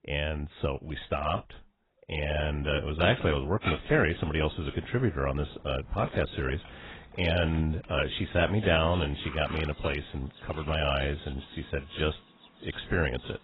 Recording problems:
garbled, watery; badly
animal sounds; noticeable; from 4 s on; 15 dB below the speech

